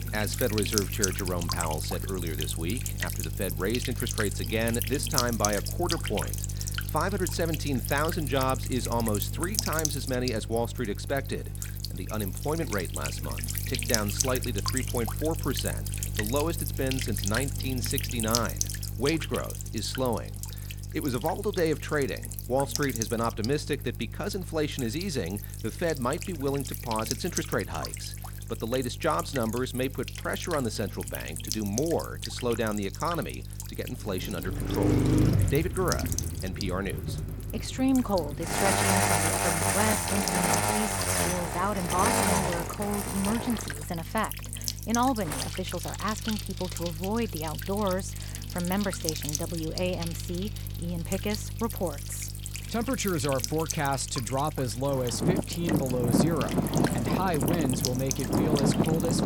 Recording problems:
traffic noise; very loud; from 35 s on; 3 dB above the speech
electrical hum; loud; throughout; 50 Hz, 5 dB below the speech

